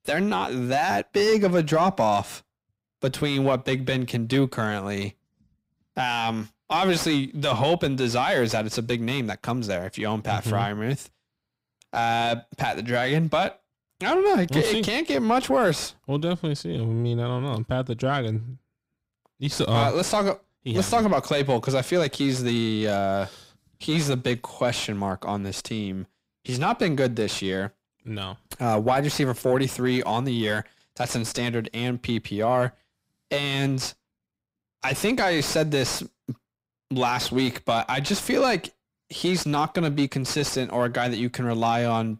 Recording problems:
distortion; slight; 10 dB below the speech

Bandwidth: 15.5 kHz